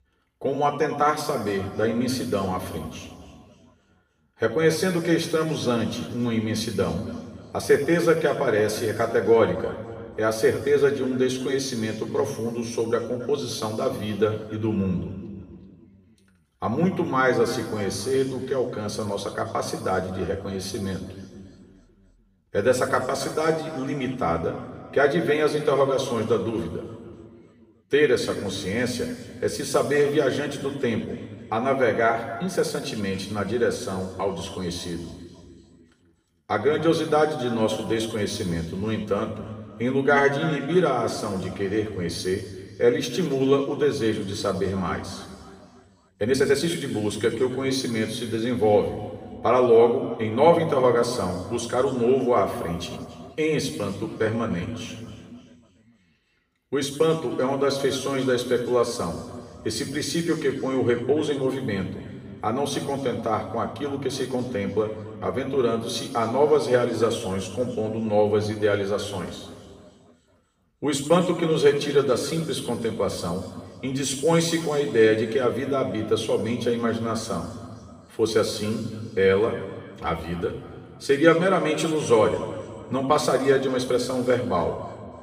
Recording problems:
off-mic speech; far
room echo; noticeable; dies away in 1.9 s
uneven, jittery; strongly; from 32 s to 1:24

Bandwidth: 15 kHz